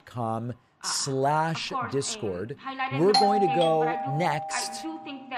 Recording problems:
voice in the background; loud; throughout; 9 dB below the speech
doorbell; loud; from 3 to 4.5 s; peak 5 dB above the speech

